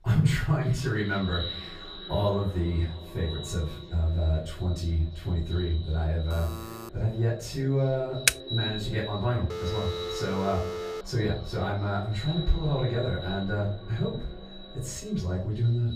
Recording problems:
echo of what is said; strong; throughout; 340 ms later, 10 dB below the speech
off-mic speech; far
room echo; slight; dies away in 0.4 s
alarm; faint; at 6.5 s; peak 10 dB below the speech
keyboard typing; very faint; at 8.5 s; peak 5 dB above the speech
phone ringing; noticeable; from 9.5 to 11 s; peak 5 dB below the speech

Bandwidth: 15 kHz